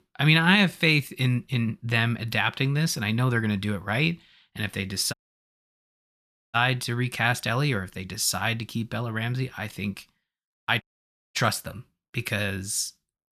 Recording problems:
audio cutting out; at 5 s for 1.5 s and at 11 s for 0.5 s

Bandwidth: 14.5 kHz